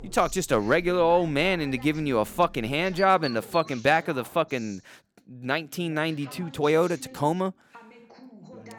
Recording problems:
animal sounds; faint; until 3.5 s; 20 dB below the speech
background chatter; faint; throughout; 2 voices, 20 dB below the speech

